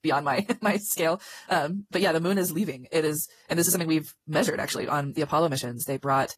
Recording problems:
wrong speed, natural pitch; too fast; 1.5 times normal speed
garbled, watery; slightly; nothing above 13.5 kHz

